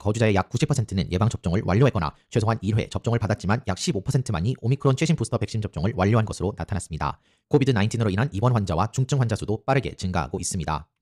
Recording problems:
wrong speed, natural pitch; too fast; 1.5 times normal speed

